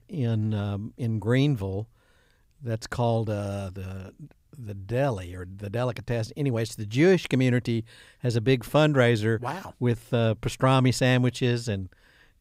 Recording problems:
none

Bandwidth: 15.5 kHz